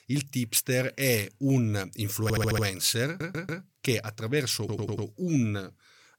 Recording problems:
audio stuttering; at 2 s, at 3 s and at 4.5 s

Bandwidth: 17.5 kHz